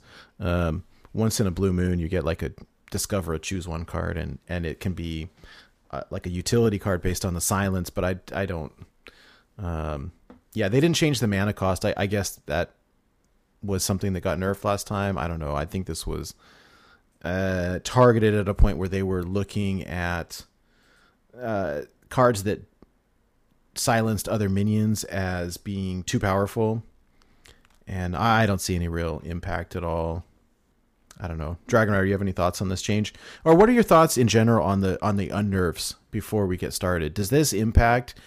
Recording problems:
none

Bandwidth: 15 kHz